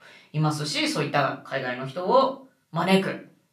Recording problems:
off-mic speech; far
room echo; slight; dies away in 0.3 s

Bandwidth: 14.5 kHz